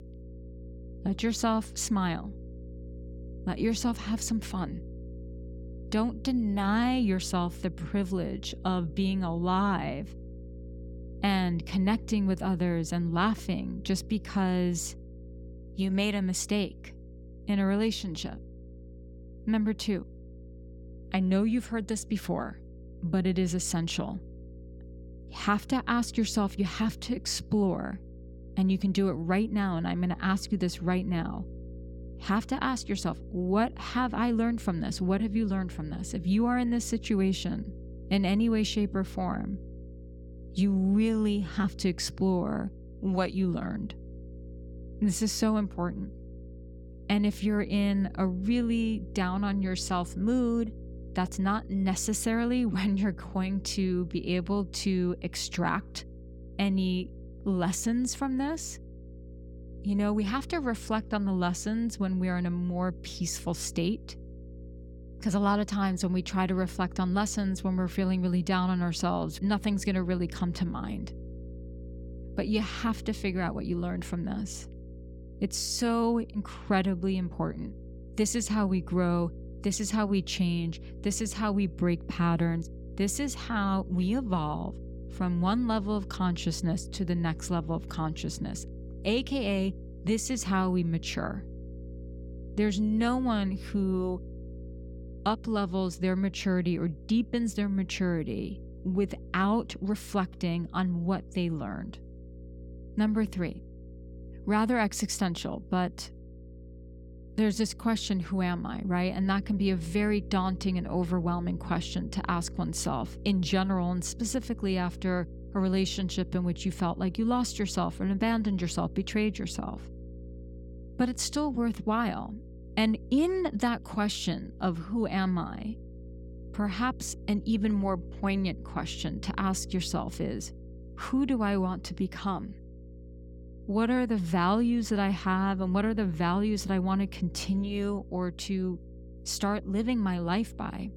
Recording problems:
electrical hum; faint; throughout; 60 Hz, 20 dB below the speech

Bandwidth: 17 kHz